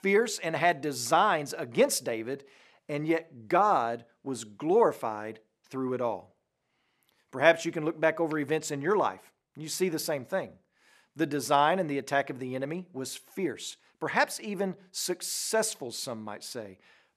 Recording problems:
none

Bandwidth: 14 kHz